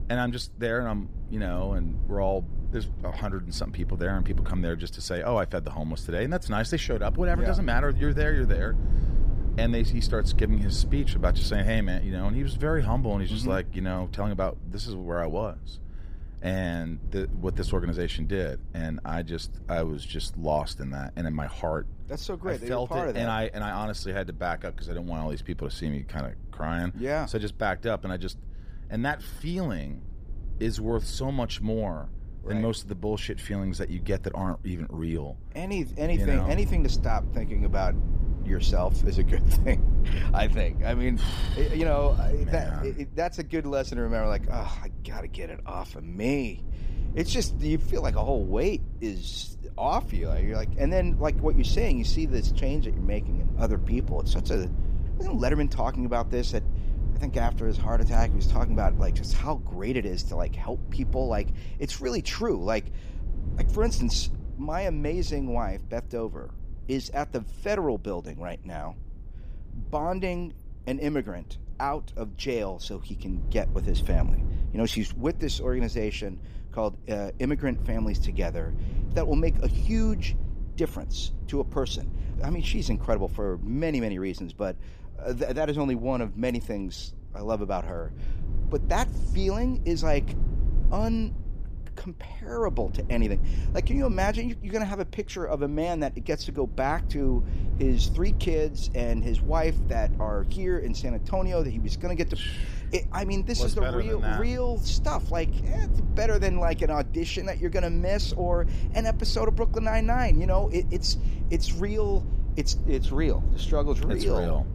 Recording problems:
low rumble; noticeable; throughout; 15 dB below the speech

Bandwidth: 15 kHz